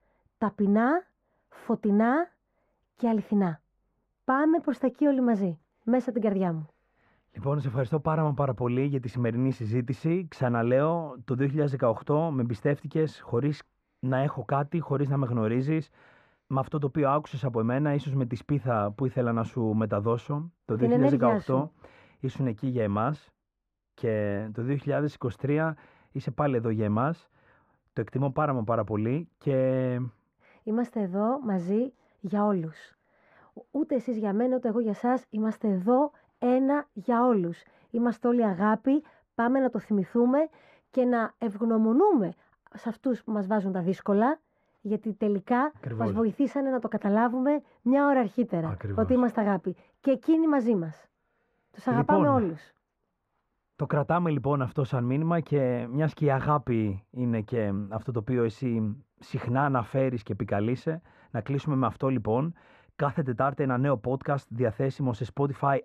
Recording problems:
muffled; very; fading above 3 kHz

